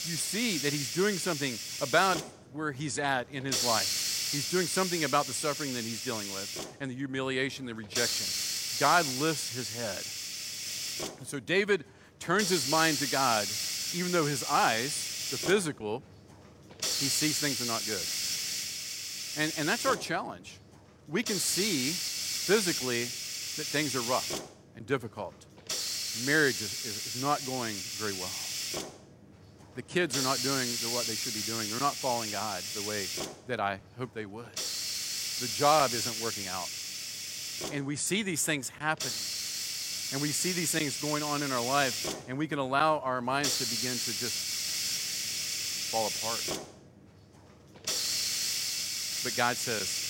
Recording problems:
hiss; loud; throughout; as loud as the speech

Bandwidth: 16 kHz